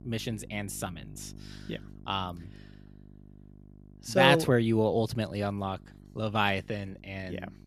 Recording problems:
electrical hum; faint; throughout; 50 Hz, 30 dB below the speech

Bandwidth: 14.5 kHz